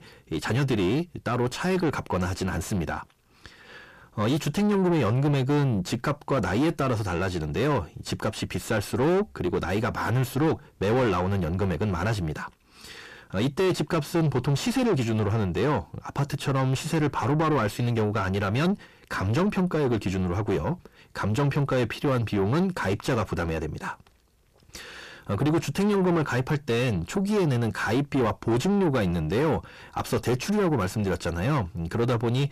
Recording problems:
distortion; heavy; 5 dB below the speech

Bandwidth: 14.5 kHz